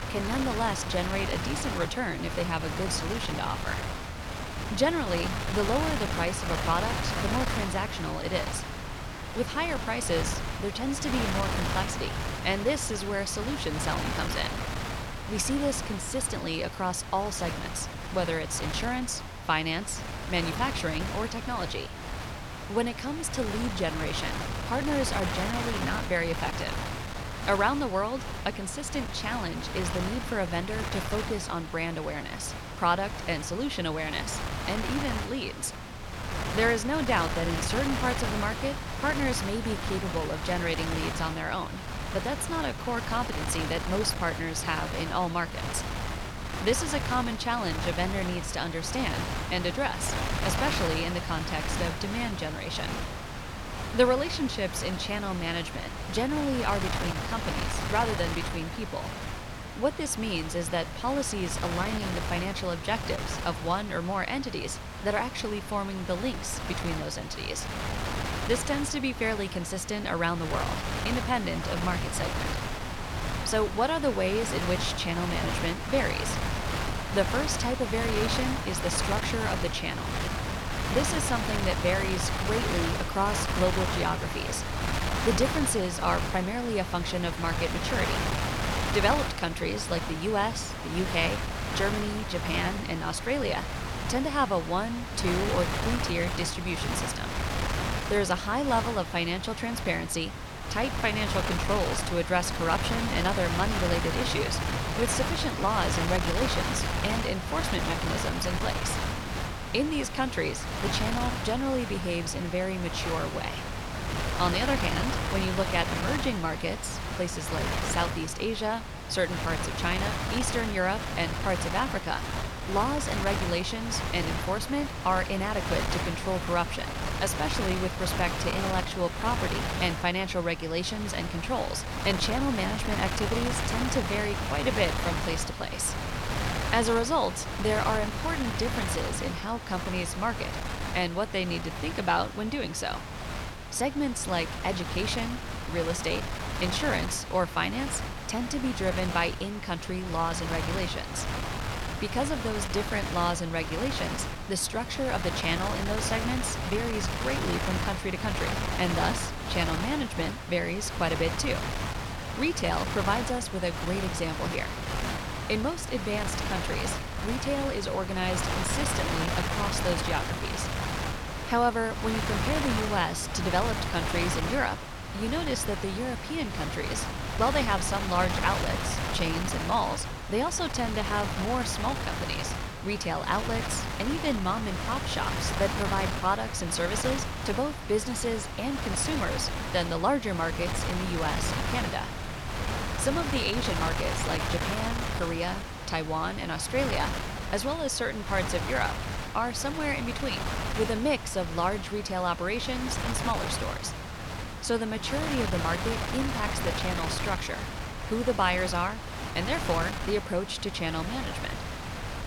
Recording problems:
wind noise on the microphone; heavy; 3 dB below the speech

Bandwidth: 18 kHz